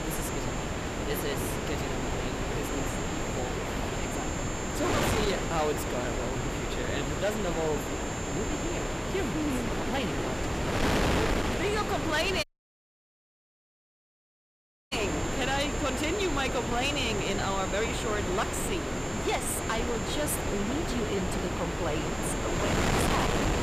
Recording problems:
distortion; slight; 11% of the sound clipped
wind noise on the microphone; heavy; as loud as the speech
high-pitched whine; loud; throughout; 7.5 kHz, 10 dB below the speech
audio cutting out; at 12 s for 2.5 s

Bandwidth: 15 kHz